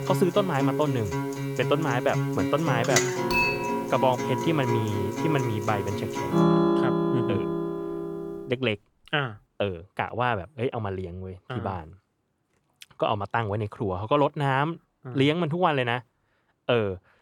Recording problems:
background music; loud; until 8.5 s; as loud as the speech
clattering dishes; loud; from 3.5 to 5.5 s; peak 4 dB above the speech

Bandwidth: 18 kHz